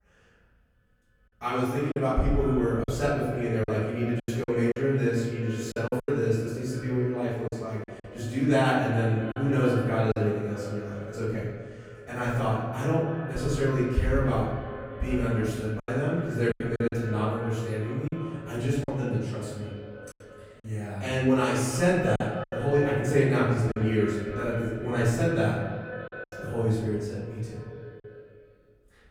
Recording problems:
room echo; strong; dies away in 1.2 s
off-mic speech; far
echo of what is said; noticeable; throughout; 300 ms later, 10 dB below the speech
choppy; occasionally; 5% of the speech affected

